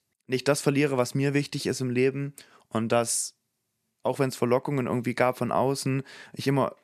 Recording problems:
none

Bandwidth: 13.5 kHz